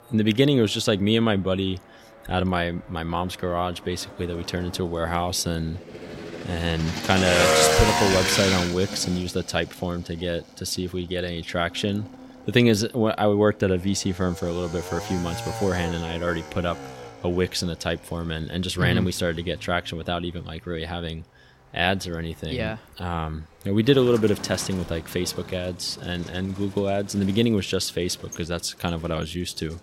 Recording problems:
traffic noise; loud; throughout; 3 dB below the speech

